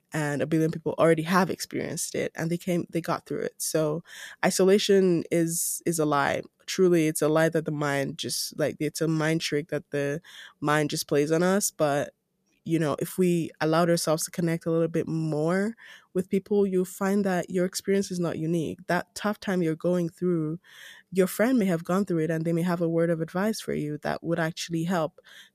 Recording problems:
none

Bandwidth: 14.5 kHz